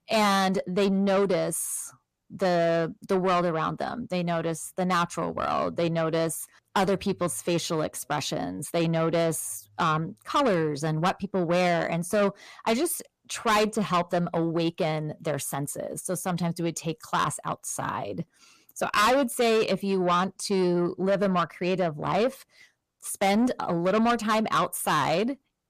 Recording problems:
distortion; heavy; 6 dB below the speech

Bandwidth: 14.5 kHz